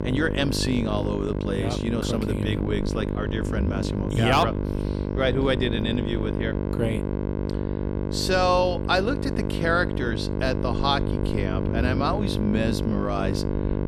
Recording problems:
electrical hum; loud; throughout; 50 Hz, 6 dB below the speech
low rumble; faint; throughout; 25 dB below the speech

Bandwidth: 18.5 kHz